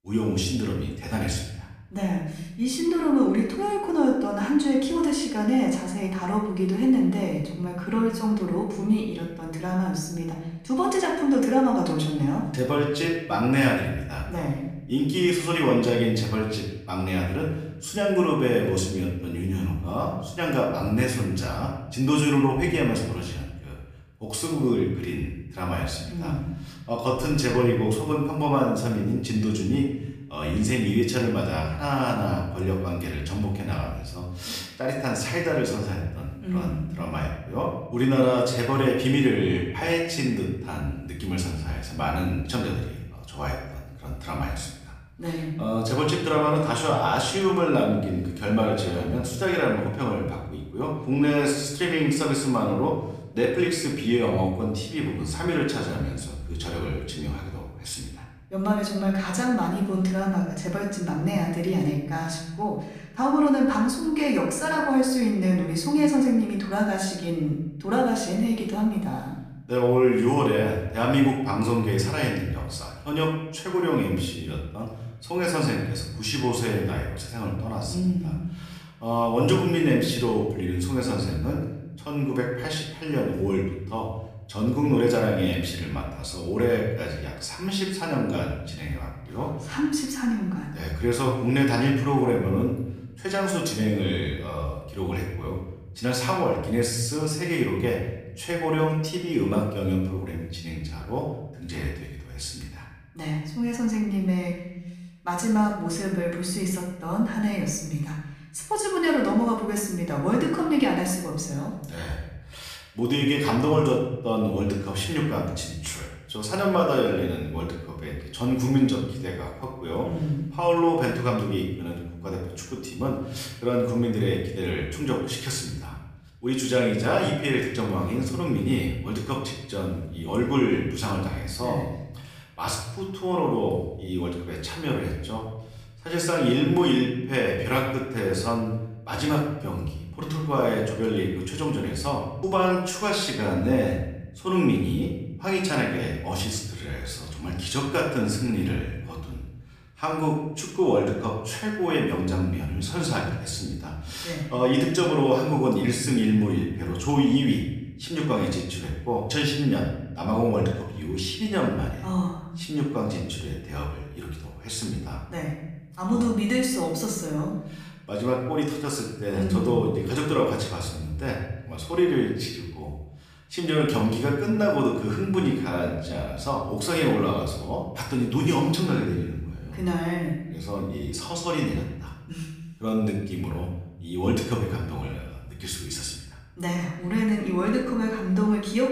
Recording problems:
off-mic speech; far
room echo; noticeable; dies away in 0.9 s

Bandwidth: 15 kHz